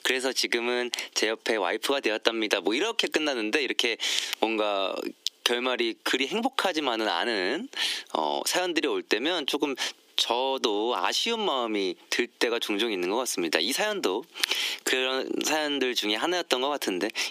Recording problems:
squashed, flat; heavily
thin; somewhat; fading below 300 Hz

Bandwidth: 15 kHz